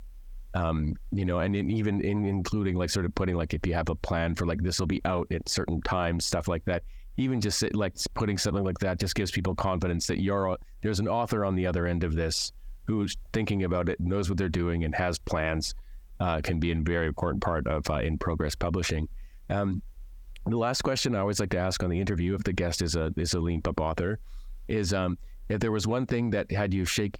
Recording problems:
squashed, flat; heavily

